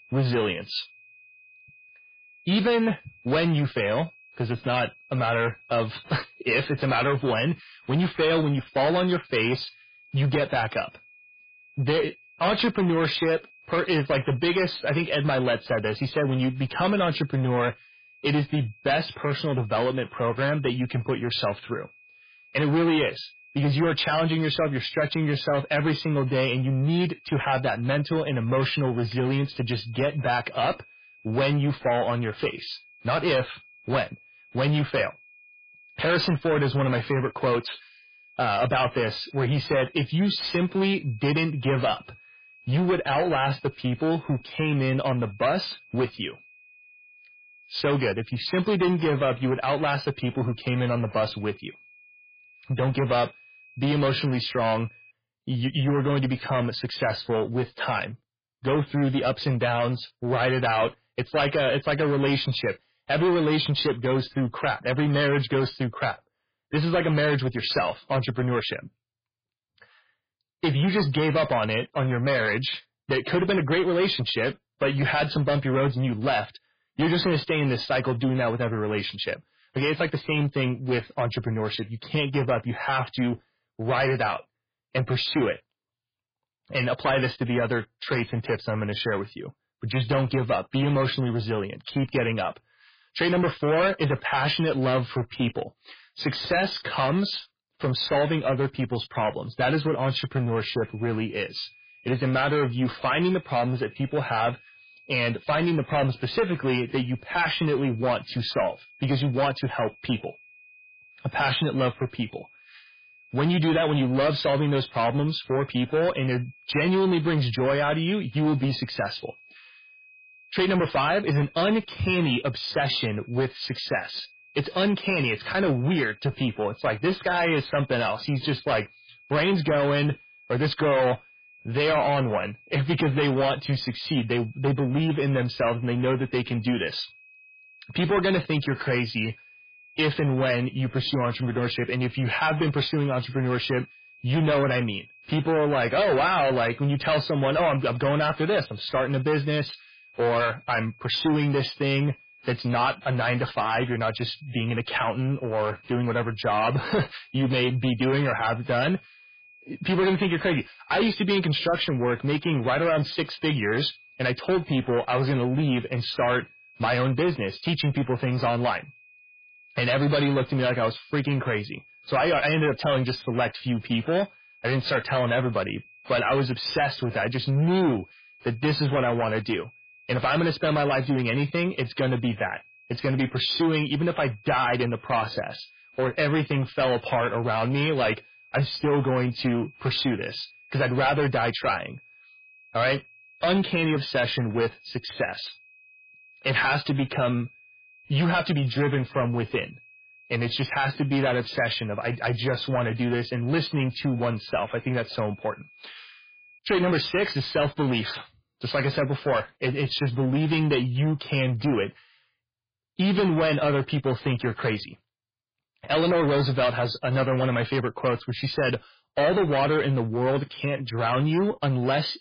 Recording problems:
distortion; heavy; 12% of the sound clipped
garbled, watery; badly; nothing above 5 kHz
high-pitched whine; faint; until 55 s and from 1:40 to 3:27; 2.5 kHz, 25 dB below the speech

